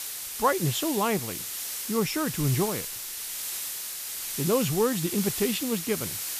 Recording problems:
hiss; loud; throughout; 4 dB below the speech

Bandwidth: 14.5 kHz